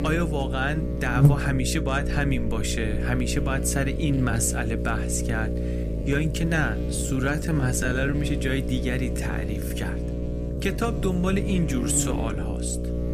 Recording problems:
electrical hum; loud; throughout; 60 Hz, 6 dB below the speech
uneven, jittery; strongly; from 4 to 13 s

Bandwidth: 15 kHz